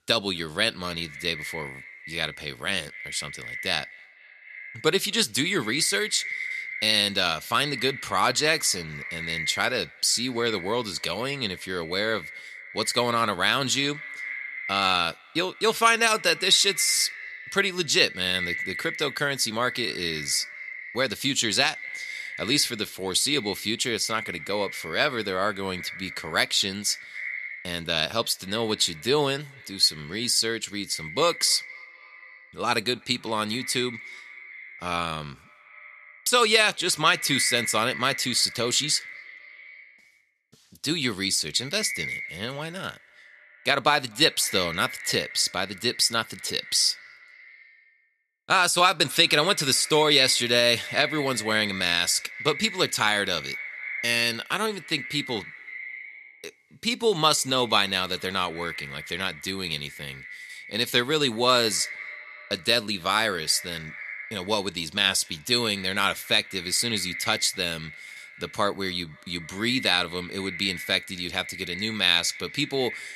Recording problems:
echo of what is said; noticeable; throughout; 250 ms later, 15 dB below the speech

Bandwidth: 13.5 kHz